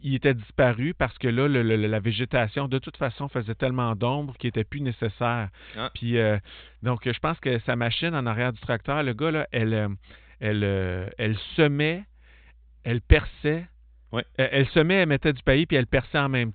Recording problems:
high frequencies cut off; severe; nothing above 4 kHz

